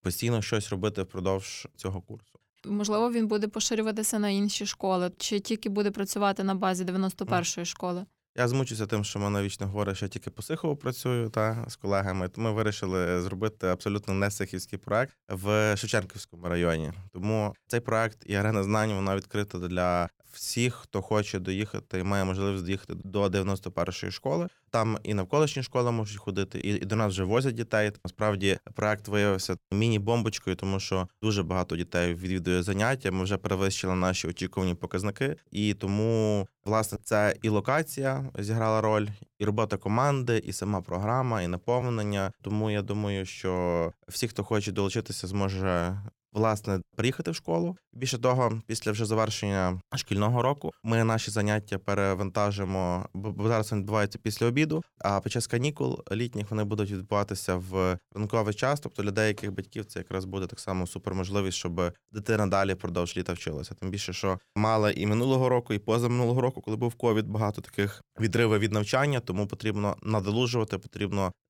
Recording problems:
uneven, jittery; slightly; from 18 to 53 s

